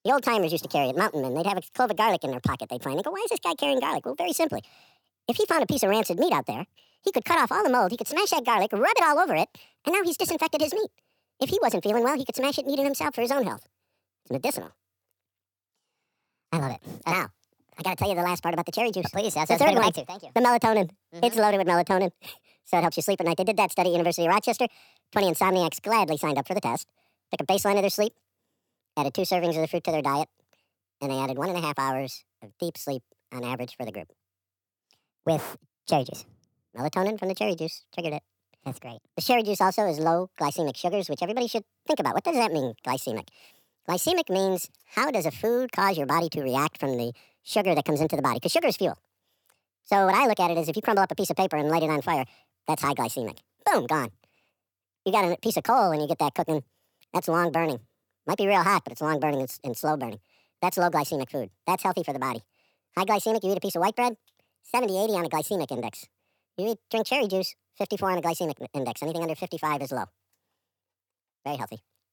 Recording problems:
wrong speed and pitch; too fast and too high; 1.6 times normal speed

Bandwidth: 19 kHz